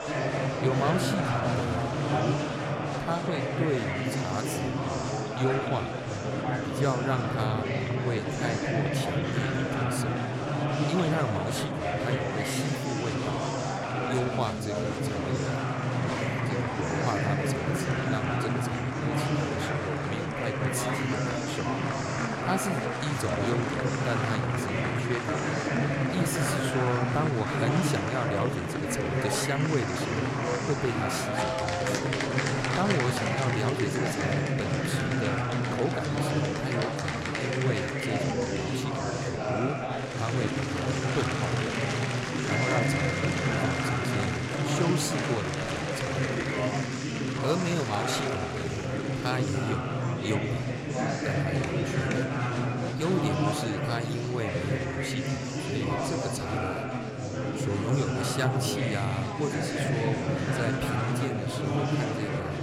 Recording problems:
murmuring crowd; very loud; throughout; 5 dB above the speech

